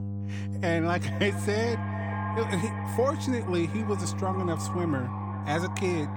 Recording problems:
echo of what is said; strong; throughout; 390 ms later, 9 dB below the speech
electrical hum; noticeable; throughout; 50 Hz, 15 dB below the speech

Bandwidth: 18.5 kHz